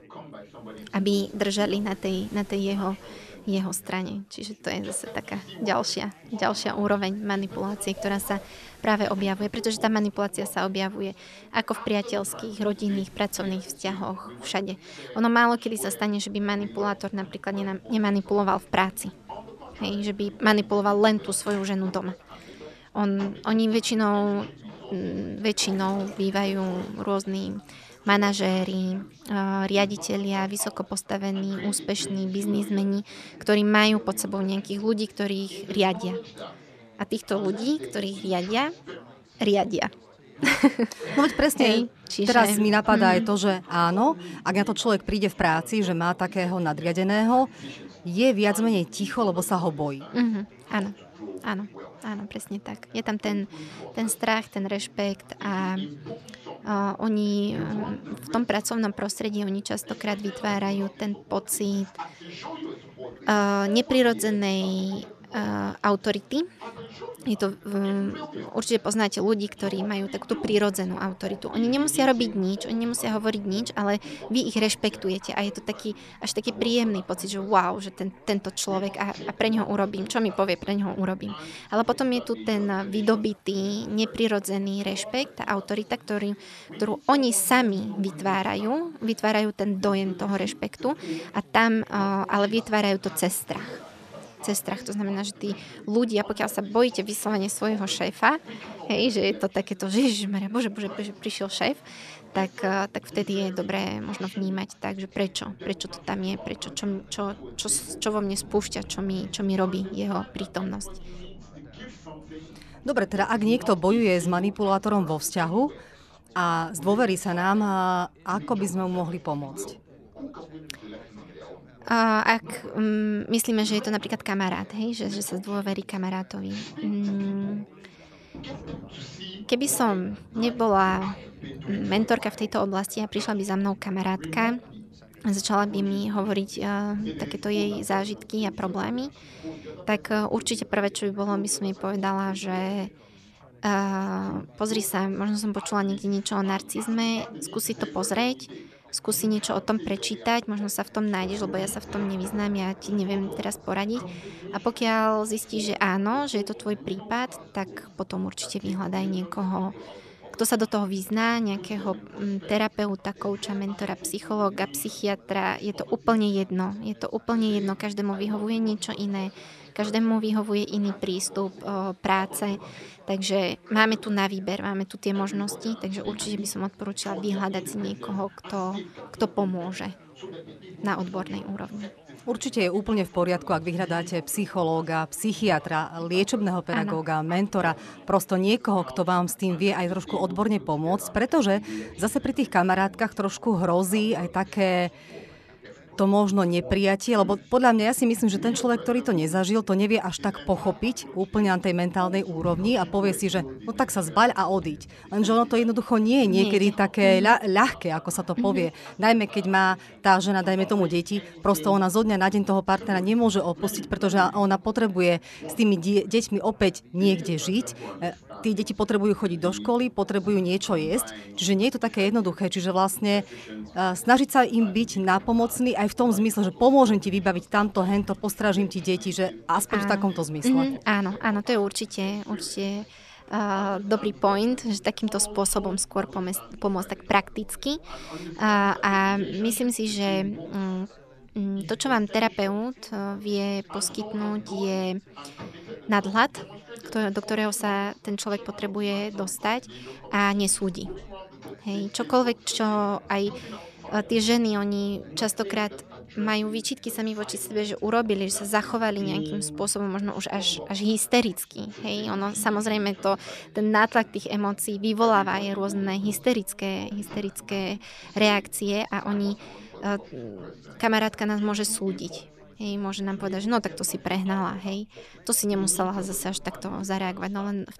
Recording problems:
background chatter; noticeable; throughout; 4 voices, 15 dB below the speech
rain or running water; faint; throughout; 30 dB below the speech

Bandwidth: 13.5 kHz